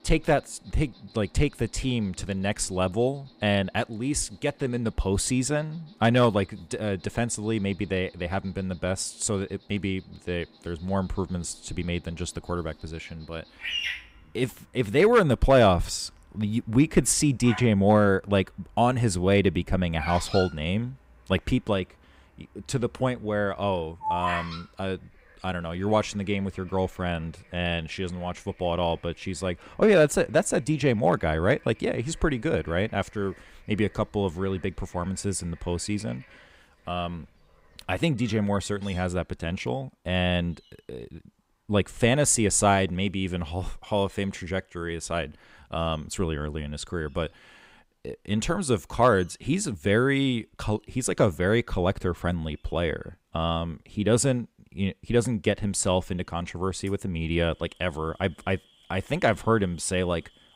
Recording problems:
animal sounds; noticeable; throughout; 15 dB below the speech

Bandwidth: 15.5 kHz